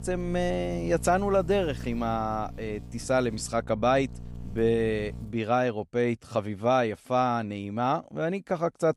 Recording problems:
electrical hum; faint; until 5.5 s; 60 Hz, 25 dB below the speech

